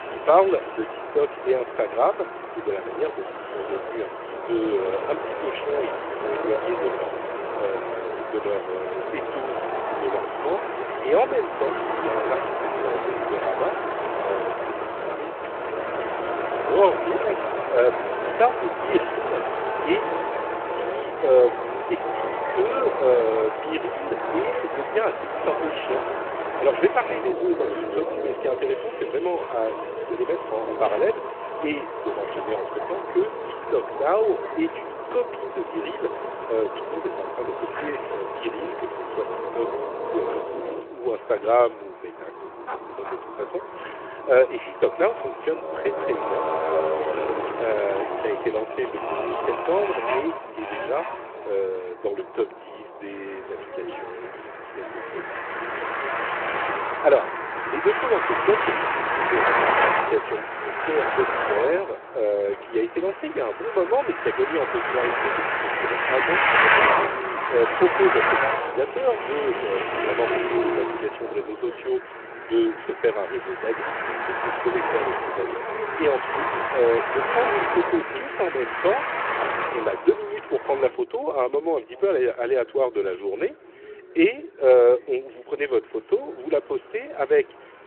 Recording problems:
phone-call audio
traffic noise; loud; throughout; 1 dB below the speech
background chatter; faint; throughout; 4 voices, 20 dB below the speech

